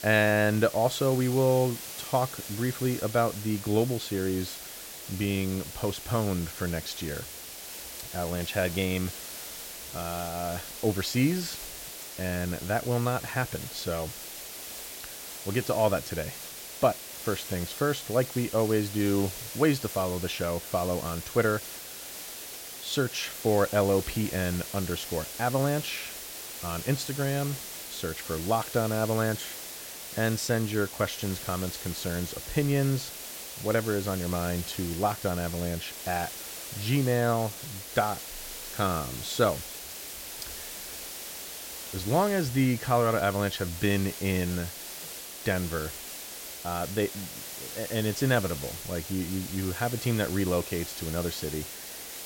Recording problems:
hiss; loud; throughout; 8 dB below the speech

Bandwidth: 16.5 kHz